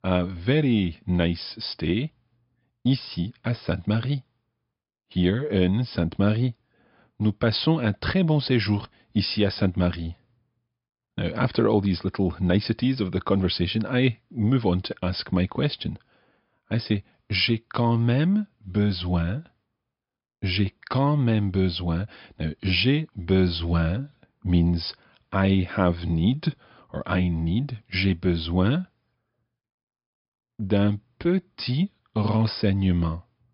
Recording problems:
high frequencies cut off; noticeable; nothing above 5.5 kHz

